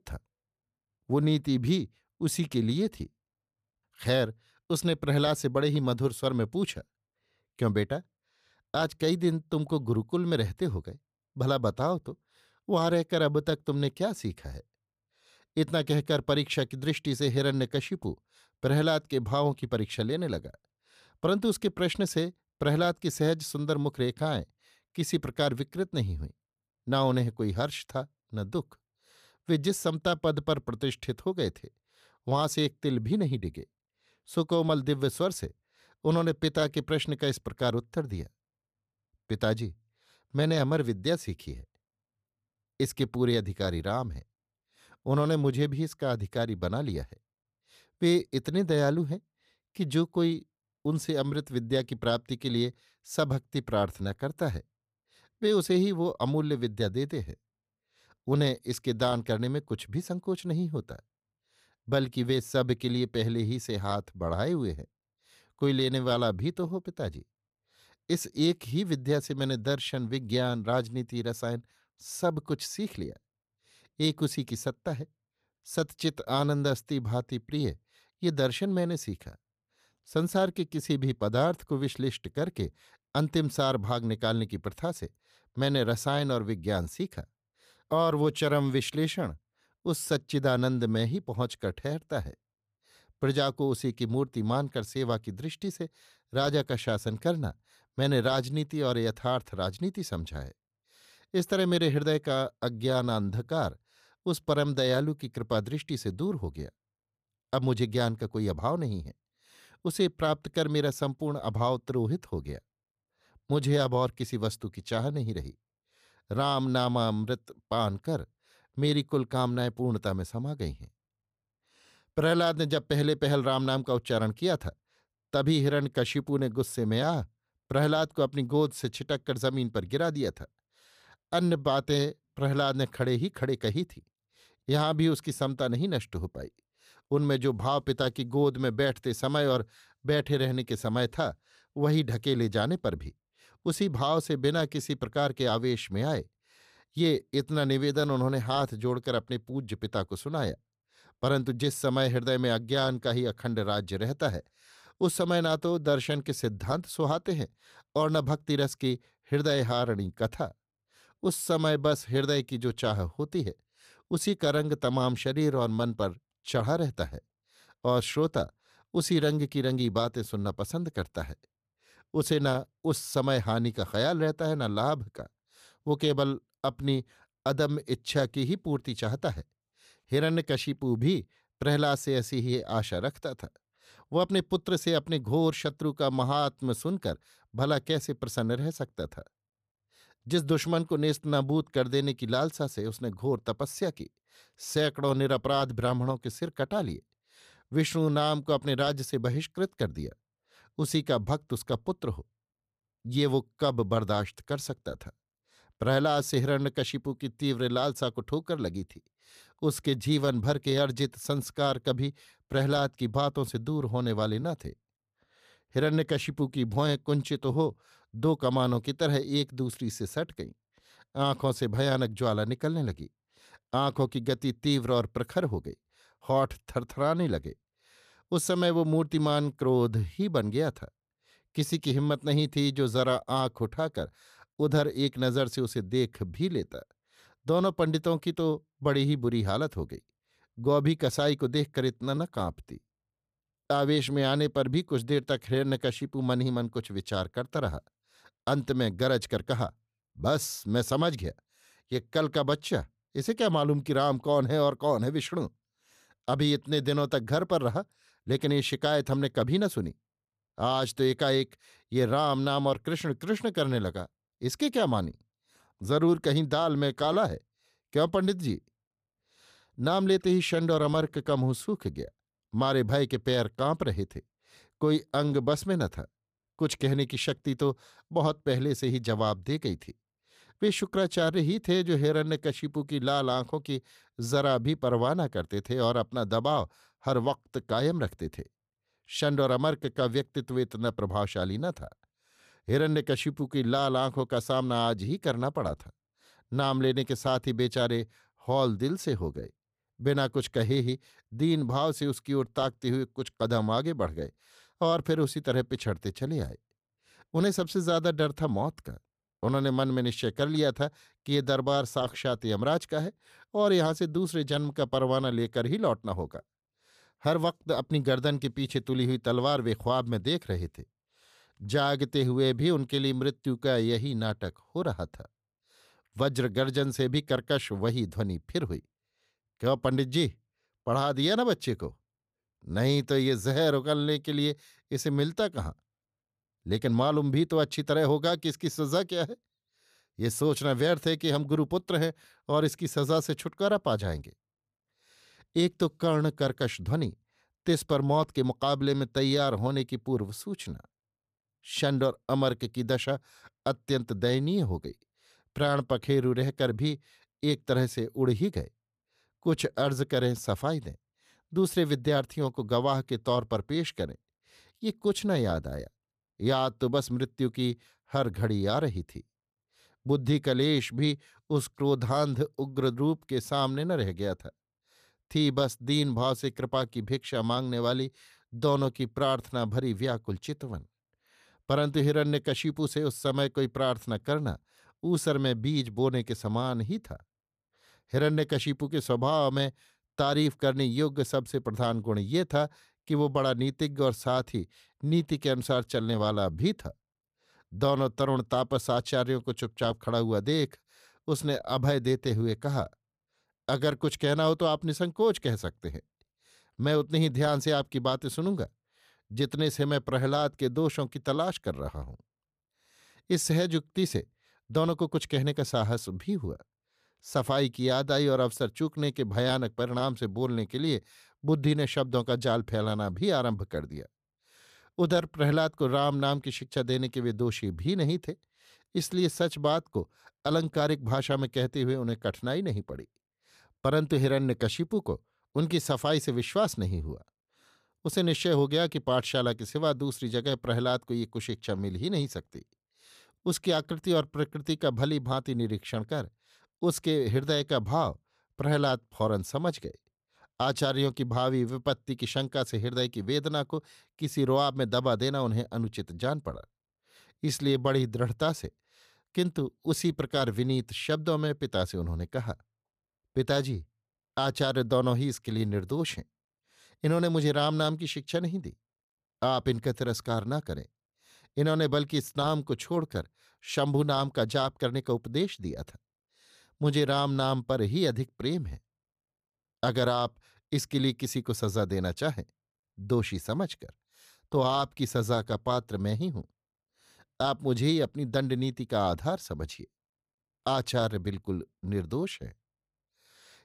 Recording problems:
none

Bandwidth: 14.5 kHz